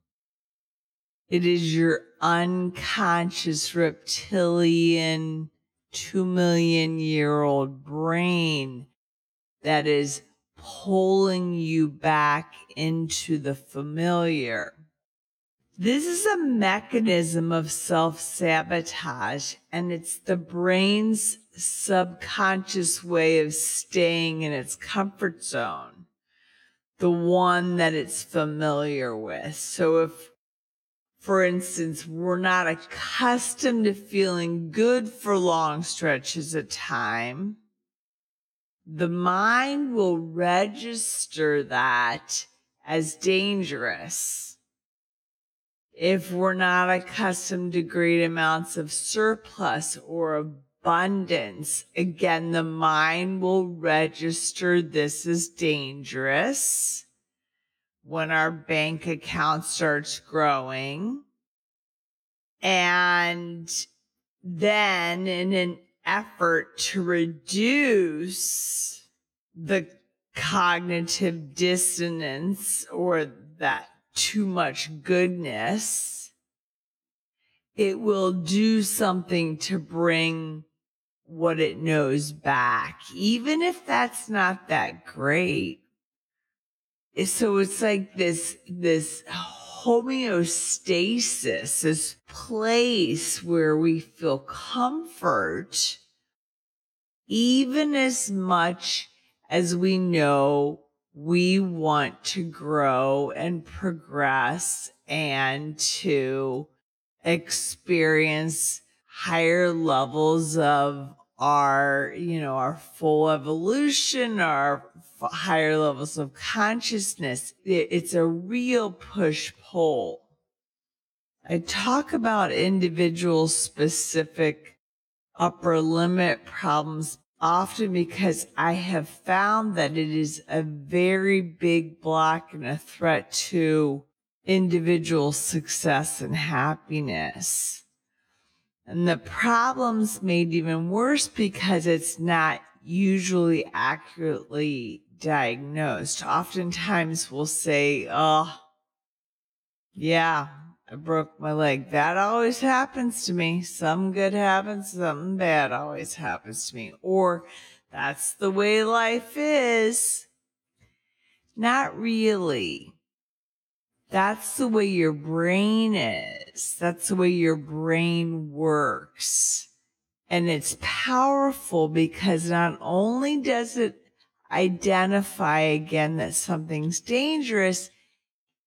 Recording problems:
wrong speed, natural pitch; too slow; 0.5 times normal speed

